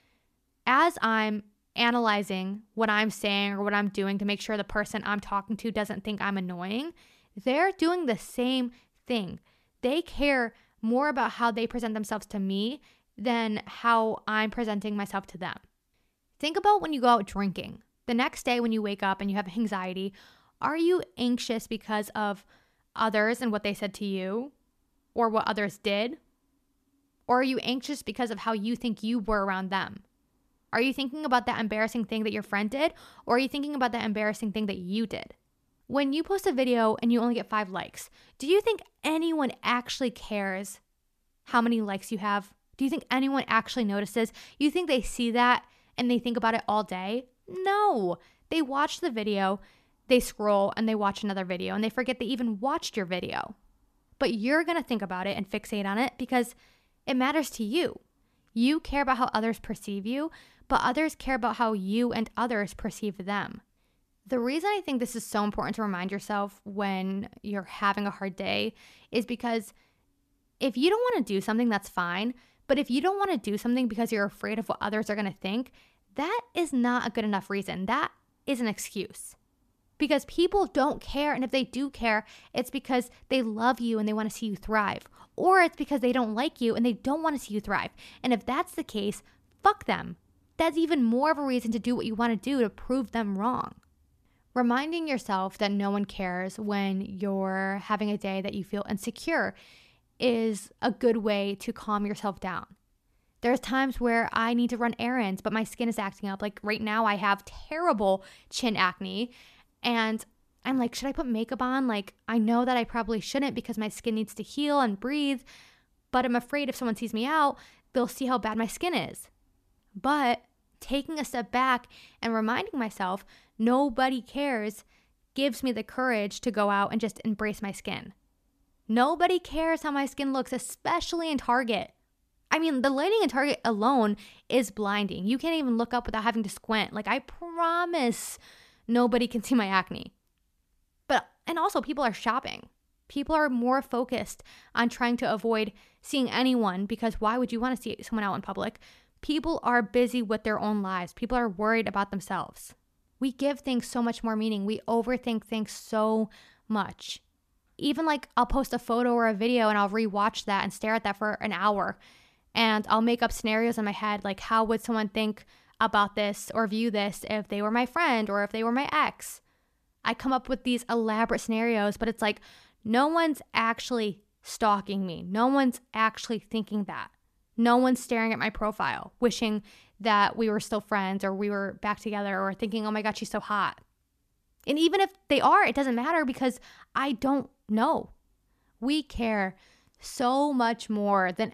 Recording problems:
none

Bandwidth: 14.5 kHz